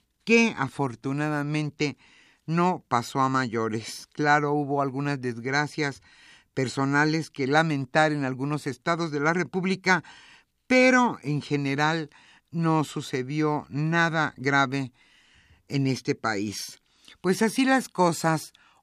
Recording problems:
none

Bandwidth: 15 kHz